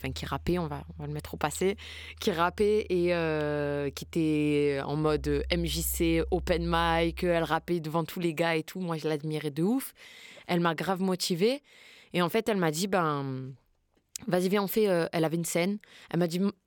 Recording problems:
background music; noticeable; until 7 s; 15 dB below the speech

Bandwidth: 17.5 kHz